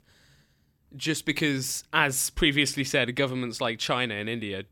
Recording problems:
none

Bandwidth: 17.5 kHz